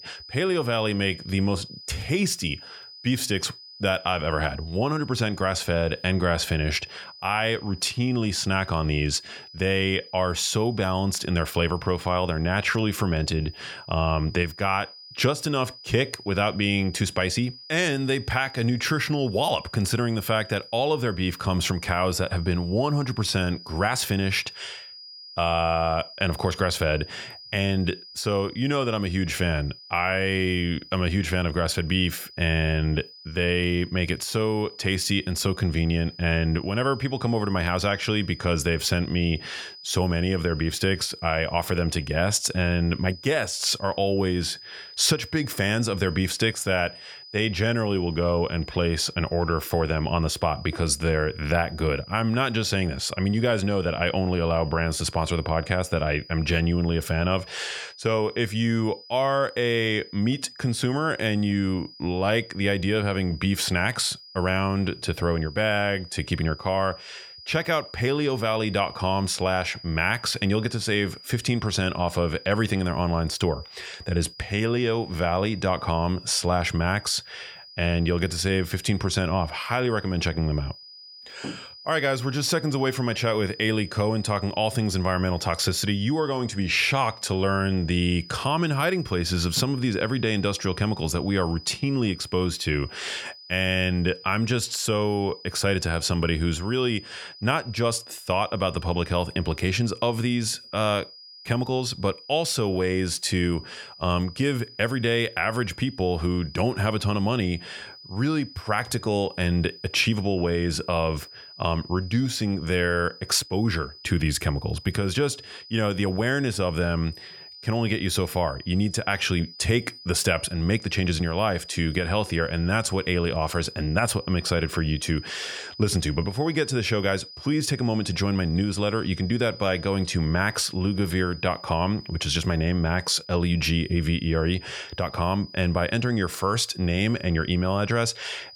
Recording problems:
high-pitched whine; noticeable; throughout; 5 kHz, 15 dB below the speech

